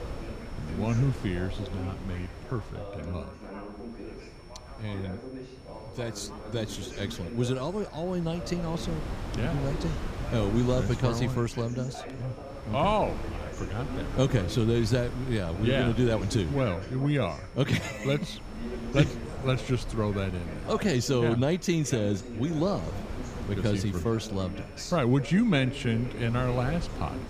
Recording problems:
background chatter; noticeable; throughout; 2 voices, 15 dB below the speech
wind noise on the microphone; occasional gusts; 15 dB below the speech
high-pitched whine; faint; throughout; 5.5 kHz, 30 dB below the speech

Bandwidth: 15 kHz